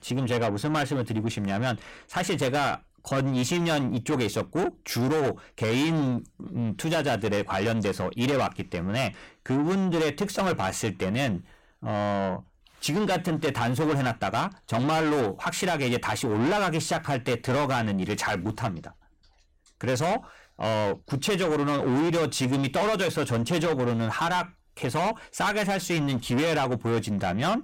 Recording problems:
distortion; heavy; 7 dB below the speech

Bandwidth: 16.5 kHz